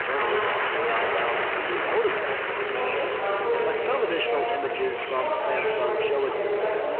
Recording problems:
phone-call audio
distortion; slight; 10 dB below the speech
murmuring crowd; very loud; throughout; 4 dB above the speech
hiss; noticeable; throughout; 20 dB below the speech

